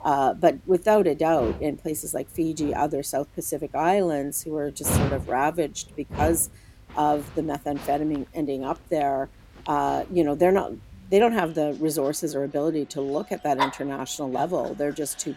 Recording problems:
animal sounds; loud; throughout; 8 dB below the speech

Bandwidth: 16.5 kHz